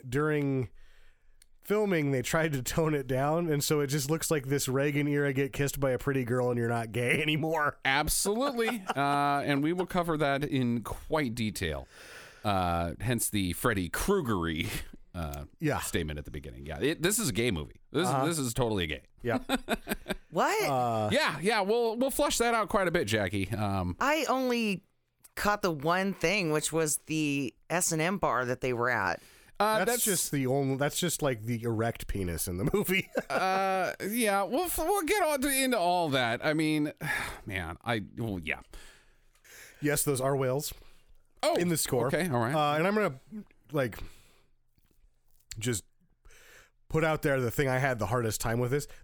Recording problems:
squashed, flat; heavily

